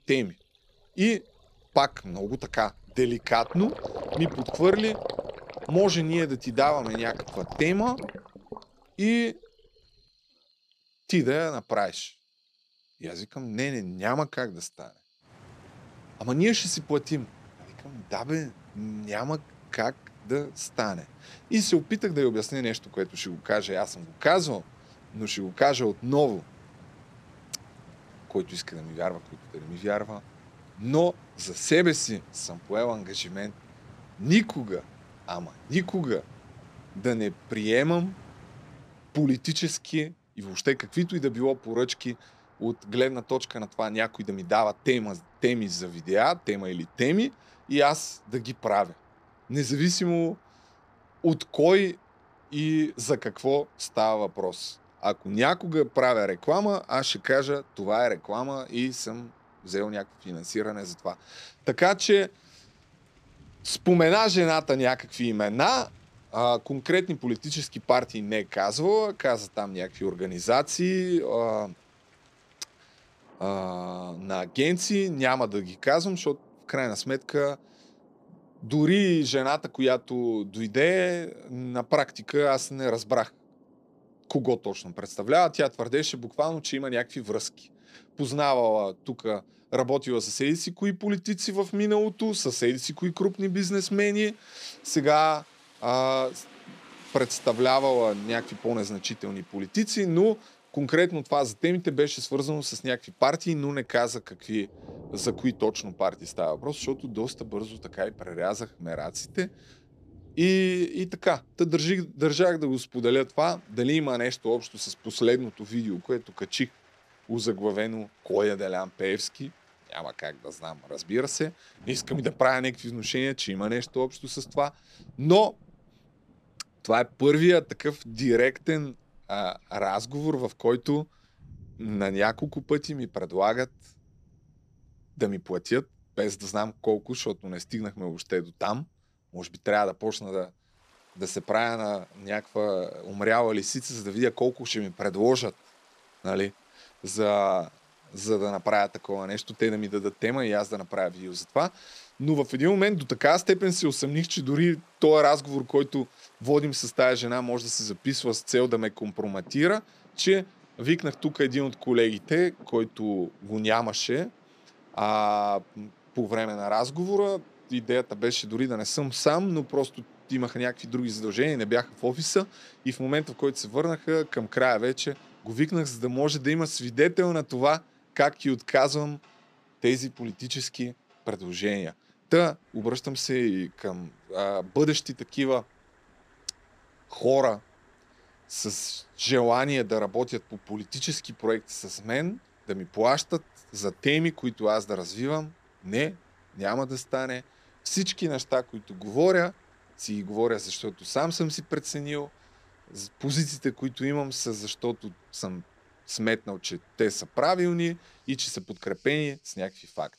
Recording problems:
rain or running water; faint; throughout; 25 dB below the speech

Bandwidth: 14.5 kHz